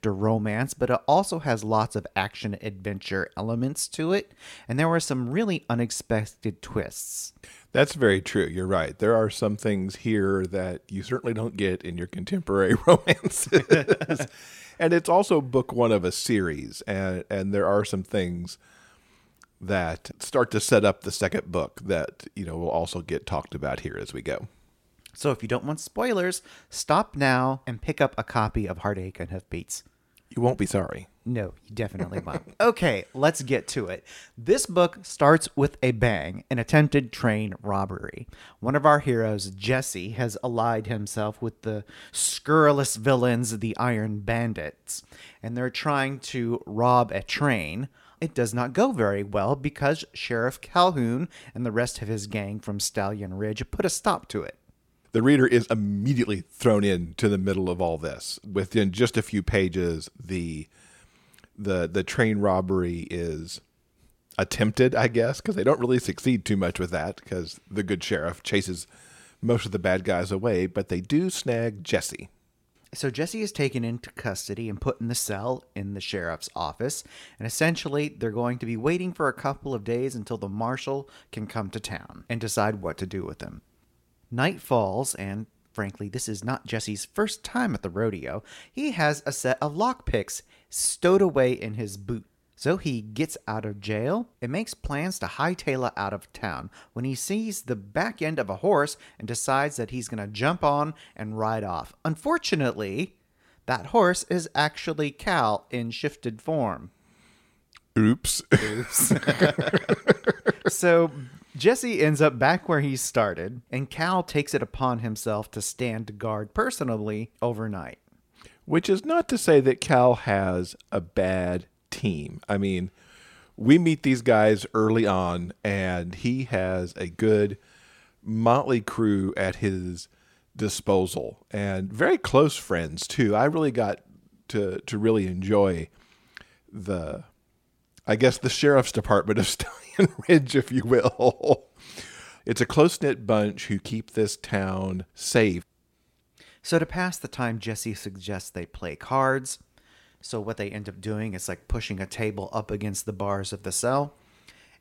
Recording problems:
none

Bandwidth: 16.5 kHz